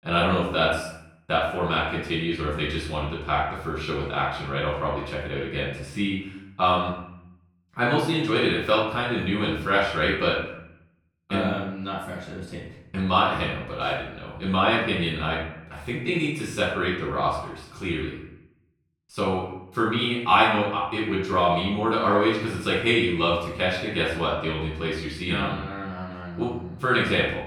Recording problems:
off-mic speech; far
room echo; noticeable; dies away in 0.7 s

